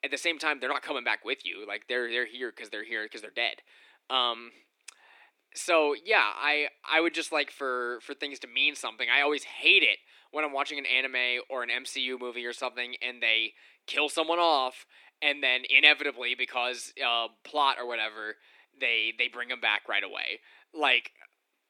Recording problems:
thin; somewhat; fading below 300 Hz

